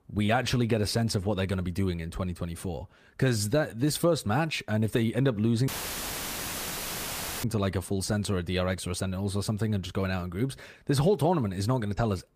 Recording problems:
audio cutting out; filled with static; at 5.5 s for 2 s

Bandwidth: 15 kHz